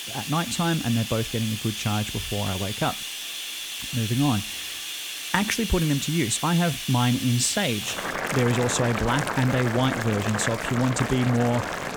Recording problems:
household noises; loud; throughout; 5 dB below the speech

